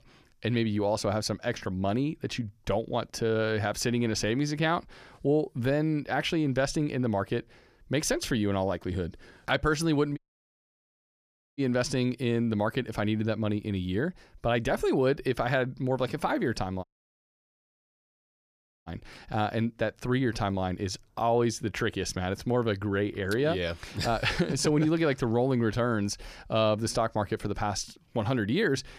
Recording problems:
audio cutting out; at 10 s for 1.5 s and at 17 s for 2 s

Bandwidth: 14.5 kHz